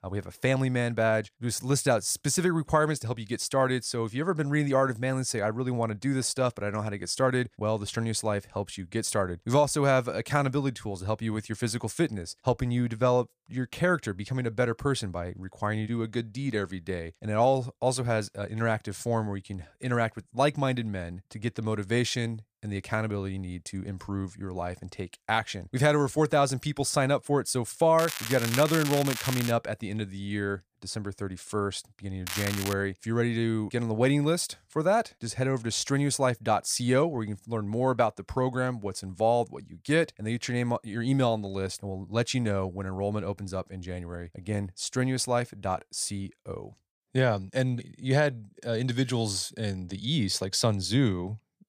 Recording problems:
crackling; loud; from 28 to 30 s and at 32 s; 5 dB below the speech

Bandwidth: 15 kHz